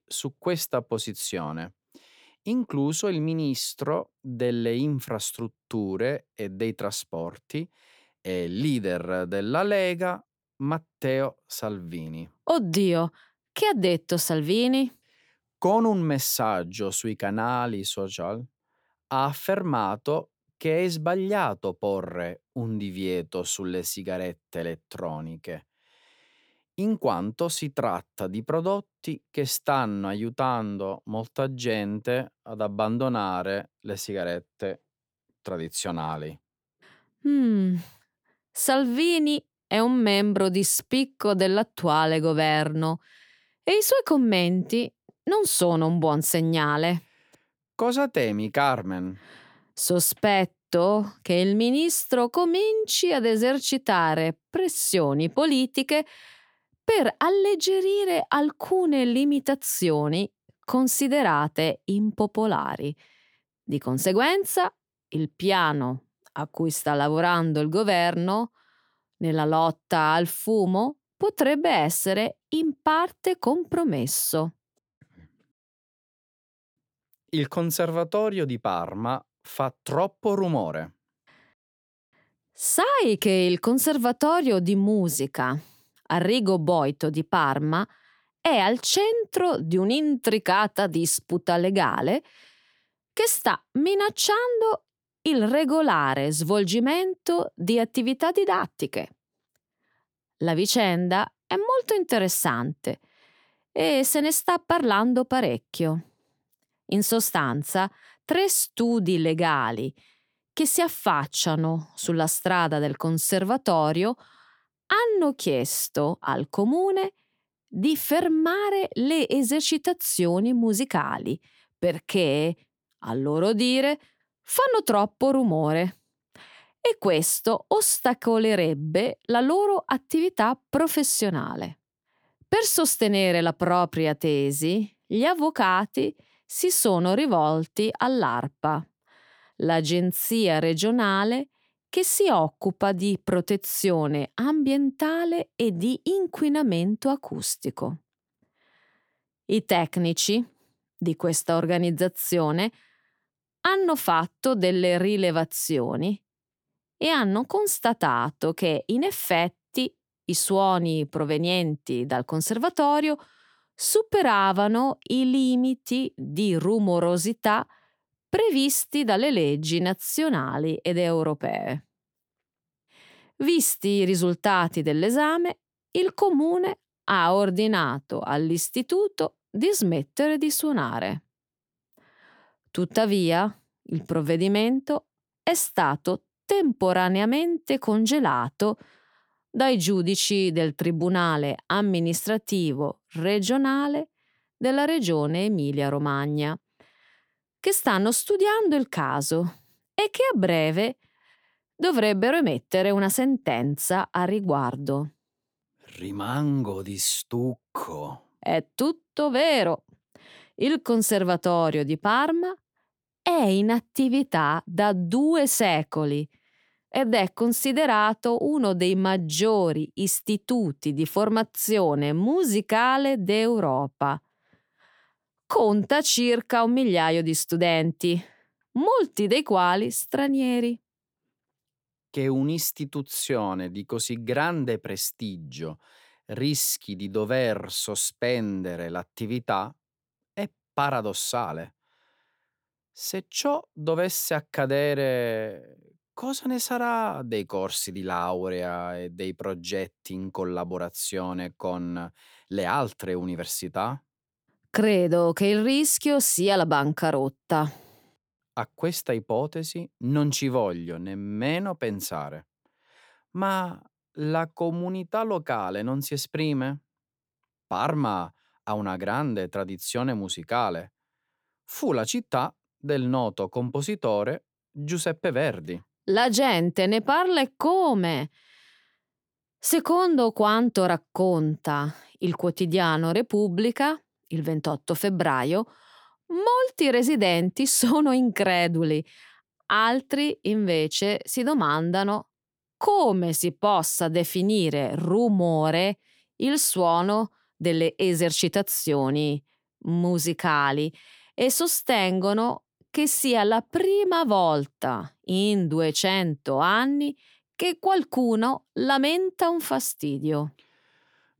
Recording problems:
none

